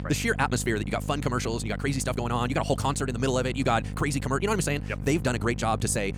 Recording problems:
wrong speed, natural pitch; too fast; 1.7 times normal speed
electrical hum; noticeable; throughout; 50 Hz, 15 dB below the speech

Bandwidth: 18 kHz